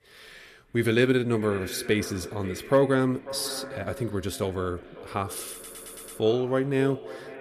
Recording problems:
echo of what is said; noticeable; throughout; 540 ms later, 15 dB below the speech
audio stuttering; at 5.5 s

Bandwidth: 14.5 kHz